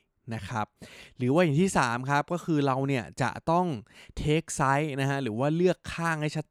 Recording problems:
none

